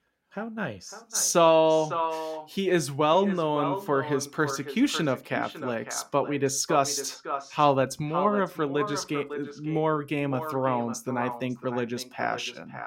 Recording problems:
echo of what is said; strong; throughout; 550 ms later, 10 dB below the speech

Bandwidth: 16 kHz